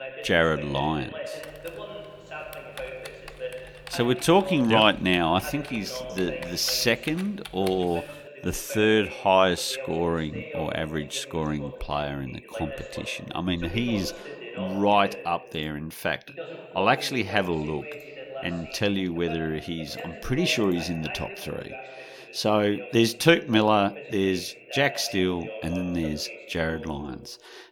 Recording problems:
voice in the background; noticeable; throughout; 15 dB below the speech
keyboard typing; faint; from 1.5 to 8 s; peak 15 dB below the speech

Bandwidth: 18.5 kHz